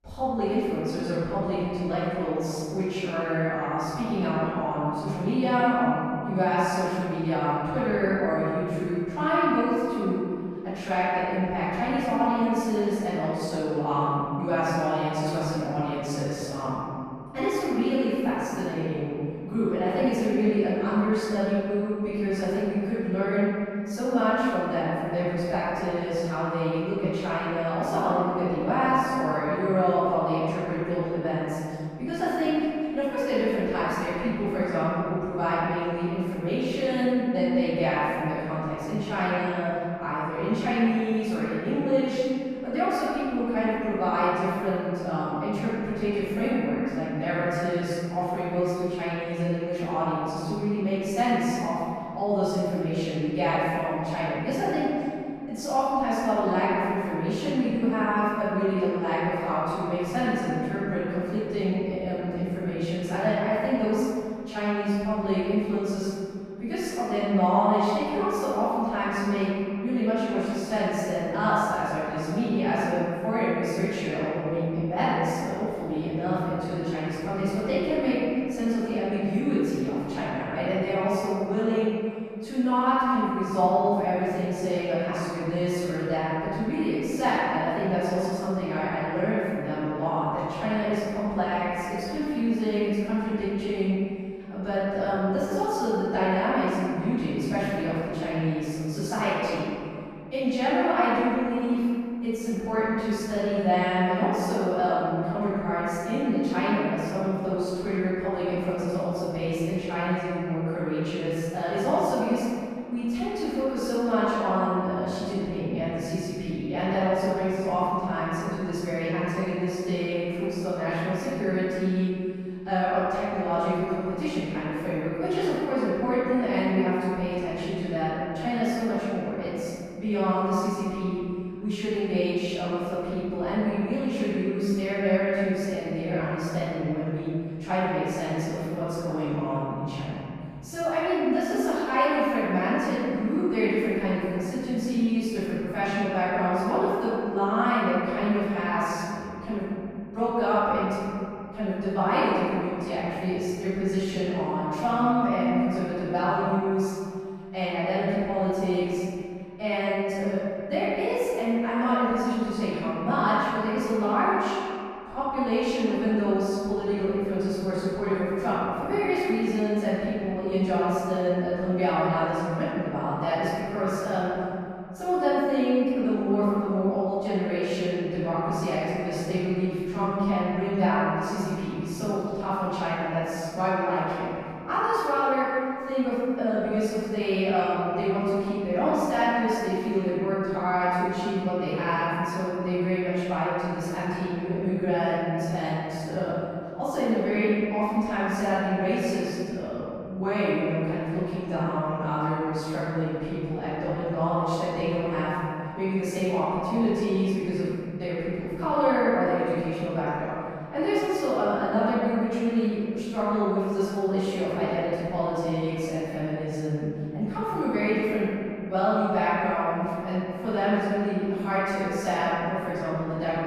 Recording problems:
room echo; strong; dies away in 2.6 s
off-mic speech; far

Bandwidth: 14.5 kHz